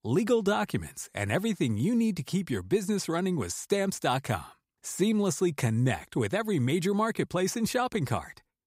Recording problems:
none

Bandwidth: 15.5 kHz